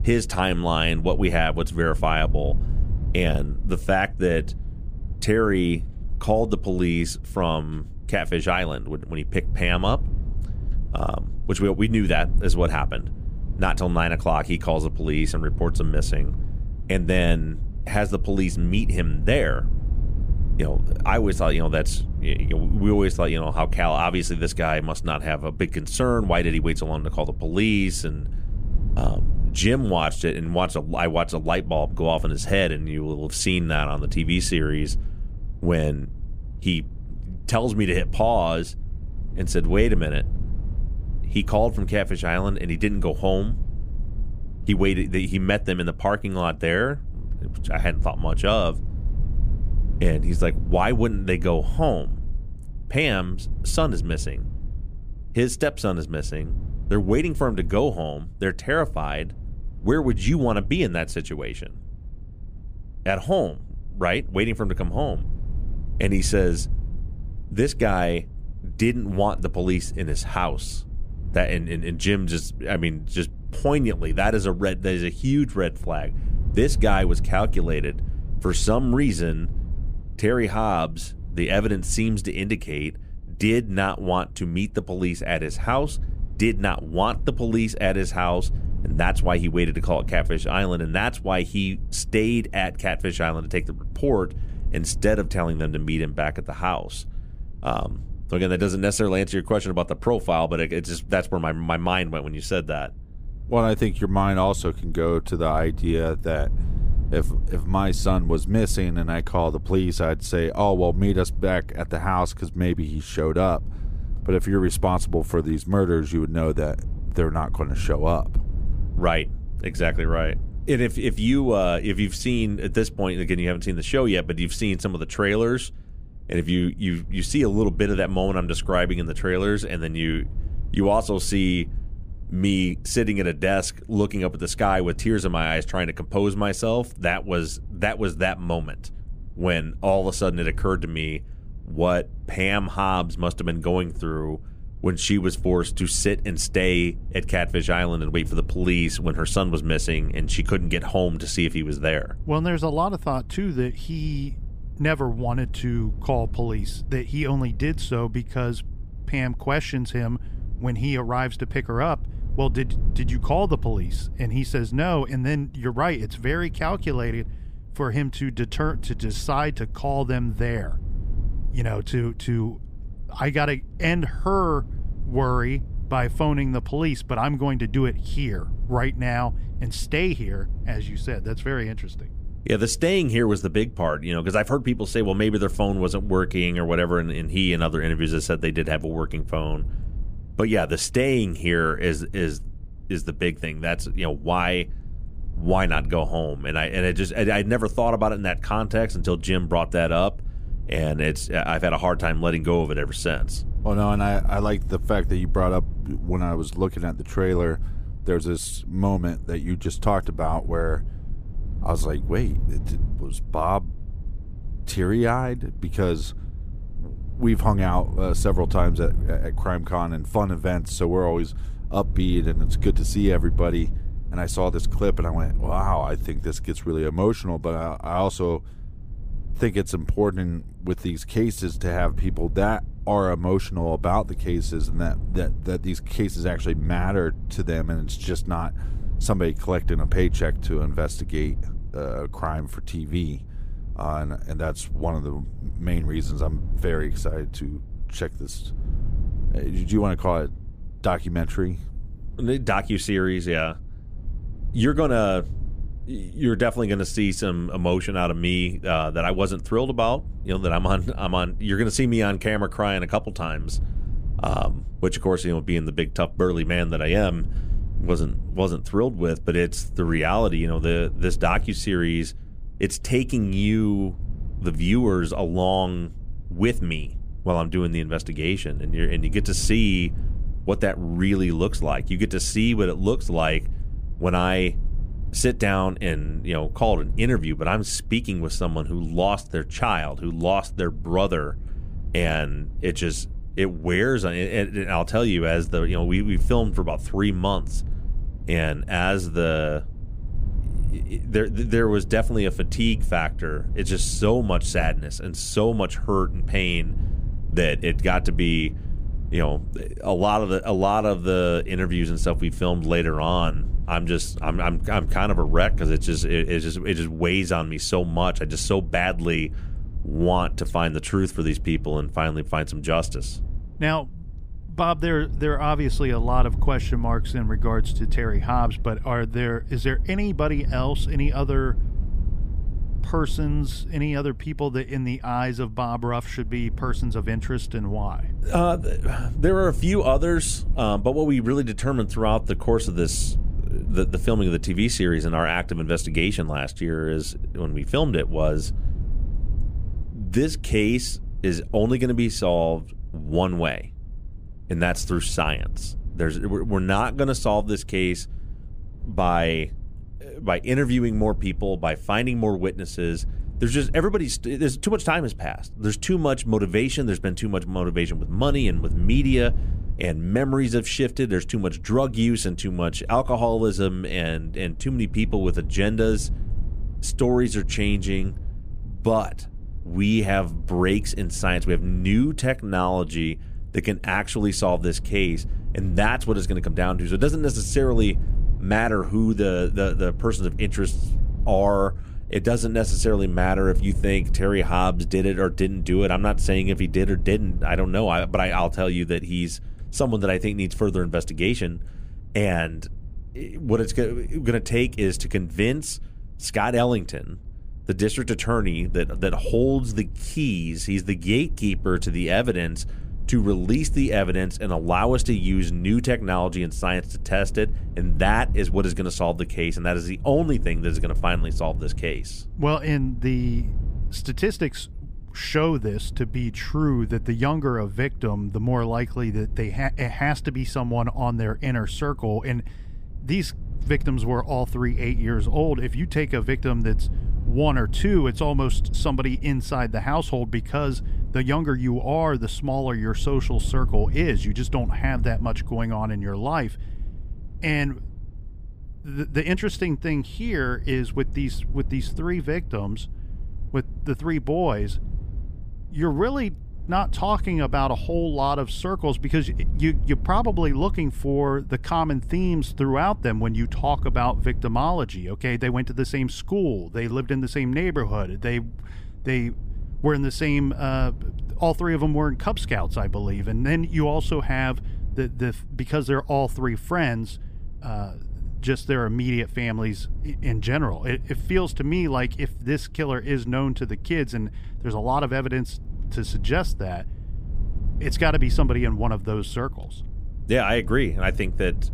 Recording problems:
low rumble; faint; throughout; 25 dB below the speech

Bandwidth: 15 kHz